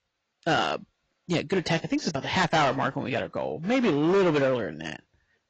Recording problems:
distortion; heavy; 9% of the sound clipped
garbled, watery; badly; nothing above 7.5 kHz

